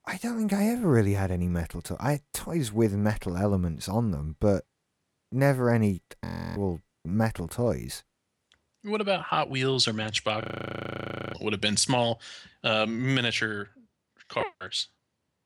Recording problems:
audio freezing; at 6.5 s and at 10 s for 1 s

